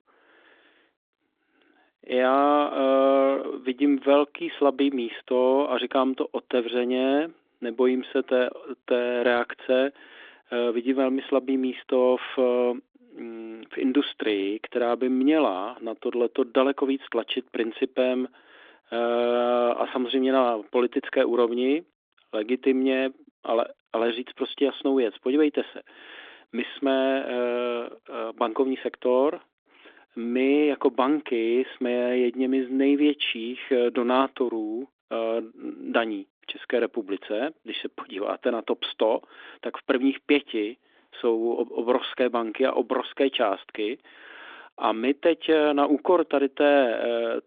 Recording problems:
phone-call audio; nothing above 3.5 kHz

